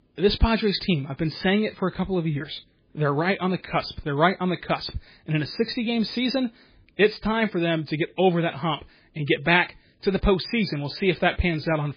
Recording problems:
garbled, watery; badly; nothing above 5 kHz

